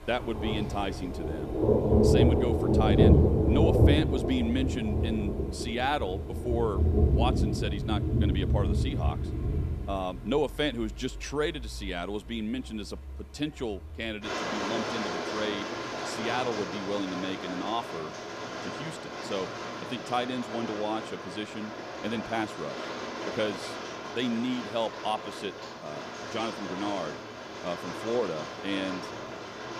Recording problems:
rain or running water; very loud; throughout; 3 dB above the speech

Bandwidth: 14.5 kHz